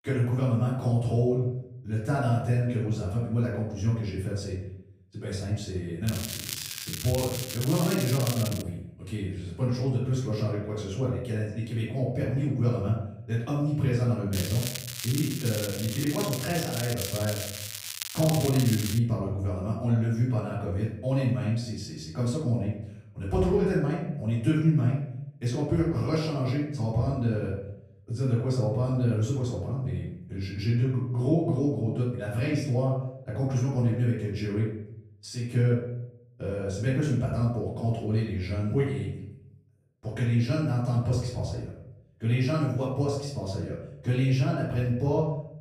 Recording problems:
off-mic speech; far
room echo; noticeable; dies away in 0.7 s
crackling; loud; from 6 to 8.5 s and from 14 to 19 s; 7 dB below the speech

